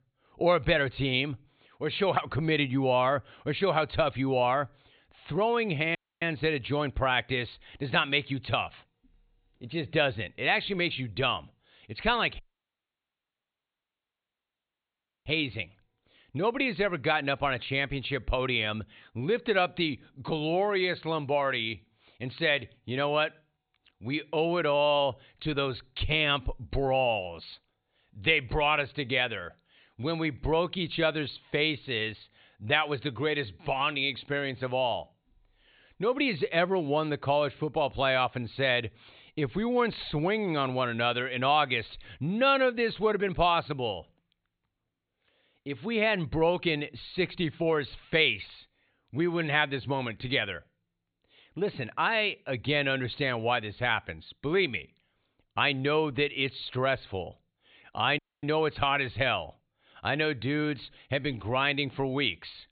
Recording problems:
high frequencies cut off; severe; nothing above 4 kHz
audio cutting out; at 6 s, at 12 s for 3 s and at 58 s

